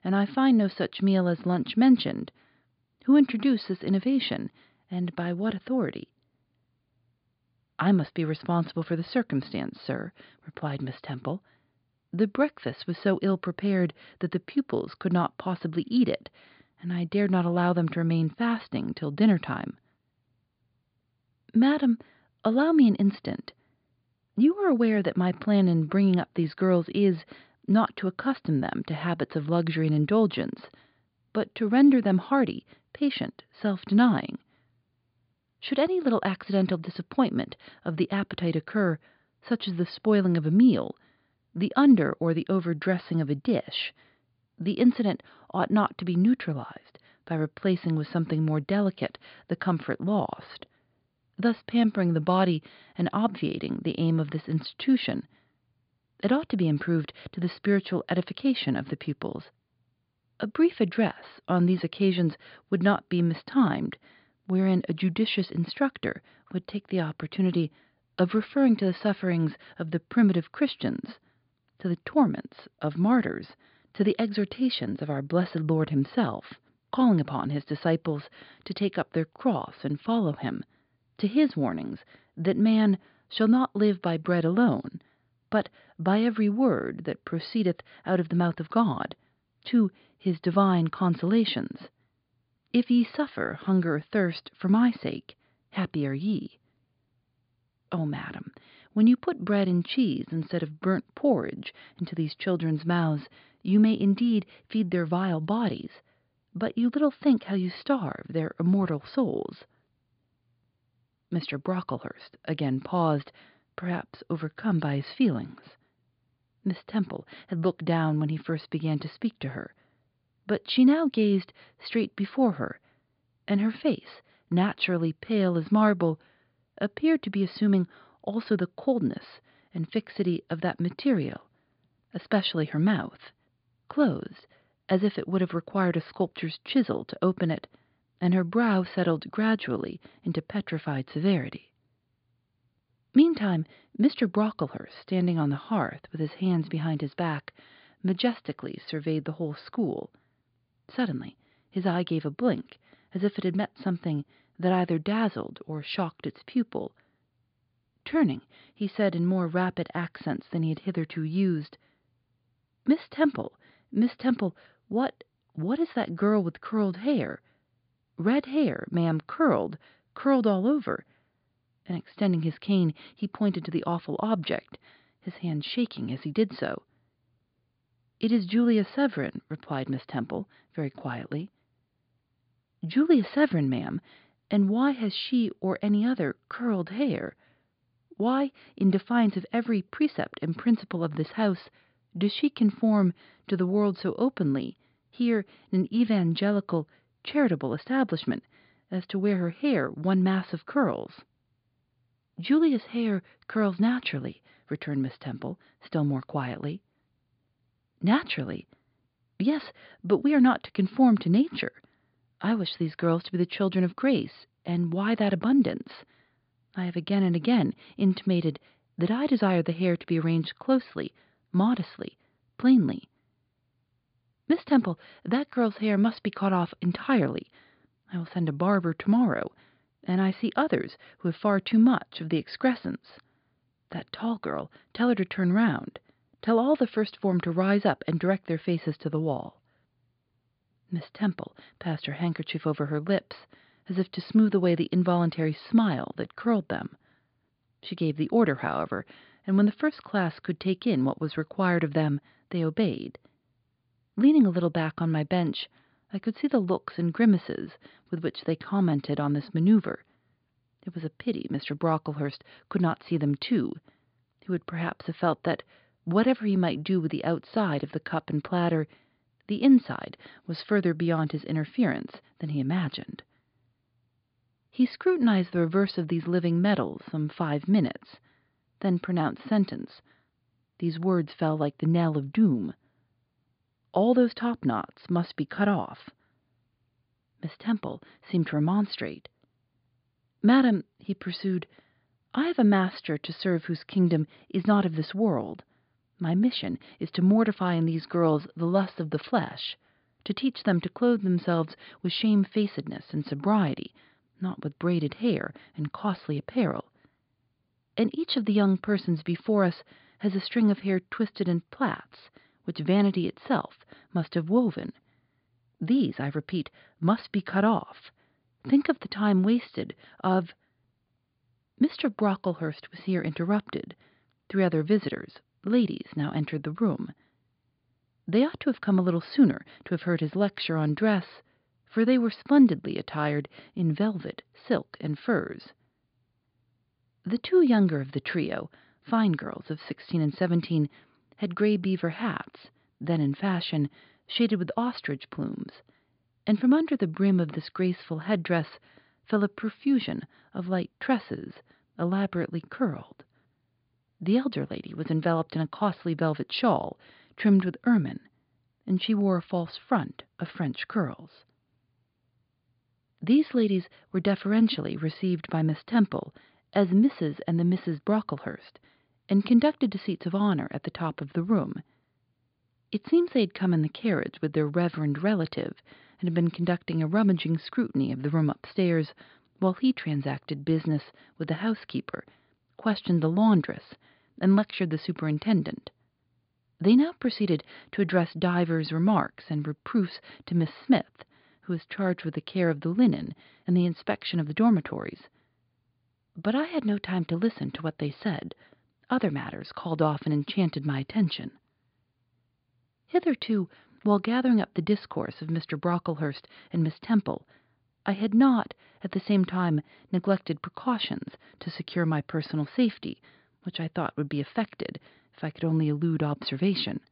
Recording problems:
high frequencies cut off; severe; nothing above 5 kHz

